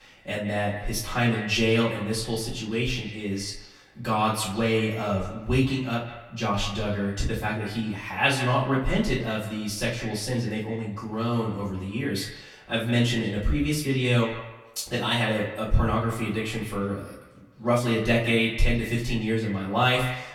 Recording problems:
off-mic speech; far
echo of what is said; noticeable; throughout; 160 ms later, 15 dB below the speech
room echo; slight; dies away in 0.3 s

